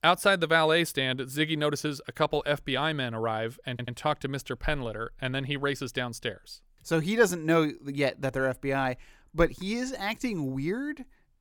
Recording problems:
audio stuttering; at 3.5 s

